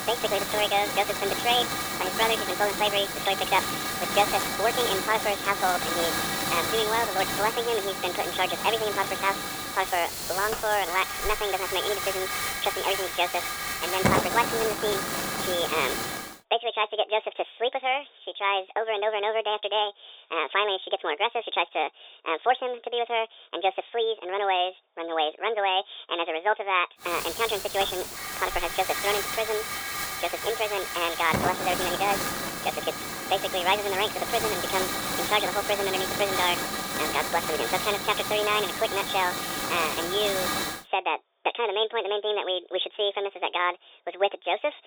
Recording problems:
thin; very; fading below 450 Hz
high frequencies cut off; severe; nothing above 3.5 kHz
wrong speed and pitch; too fast and too high; 1.7 times normal speed
hiss; loud; until 16 s and from 27 to 41 s; 2 dB below the speech

